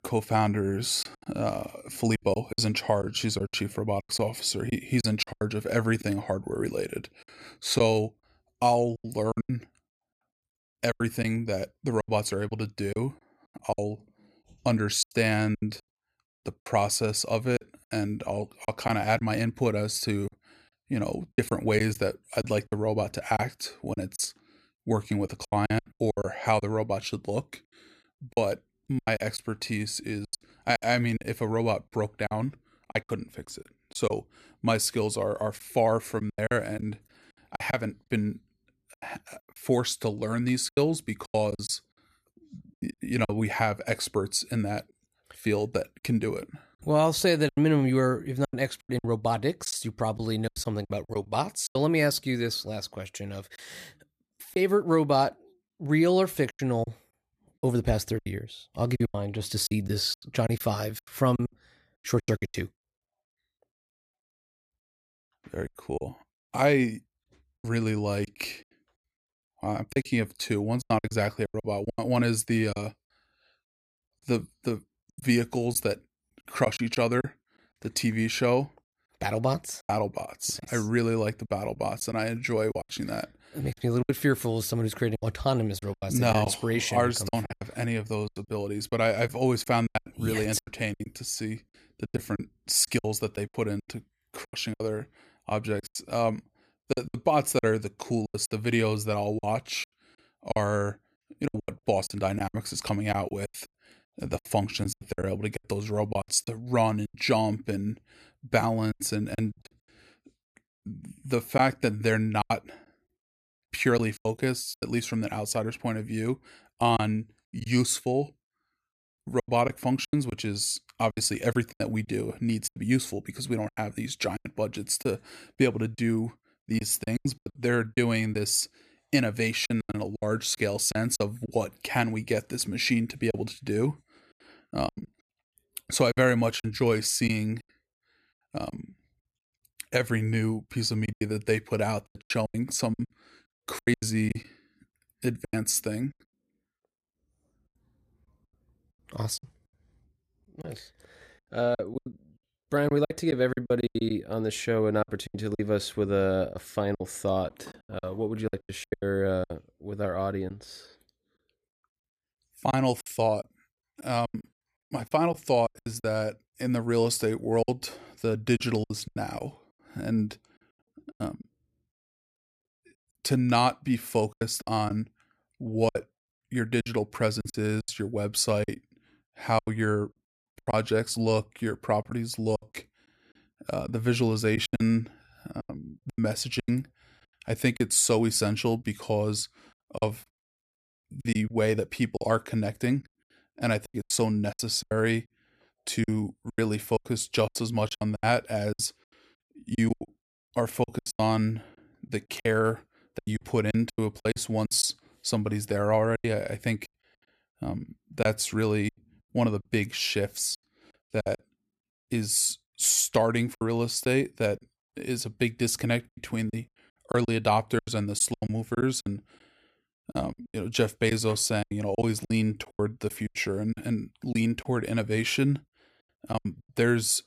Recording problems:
choppy; very; 11% of the speech affected

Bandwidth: 14.5 kHz